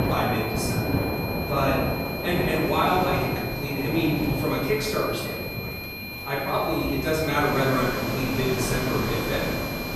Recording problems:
off-mic speech; far
room echo; noticeable; dies away in 1.4 s
high-pitched whine; loud; throughout; 2.5 kHz, 8 dB below the speech
rain or running water; loud; throughout; 4 dB below the speech
background chatter; faint; throughout; 3 voices, 30 dB below the speech

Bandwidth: 15 kHz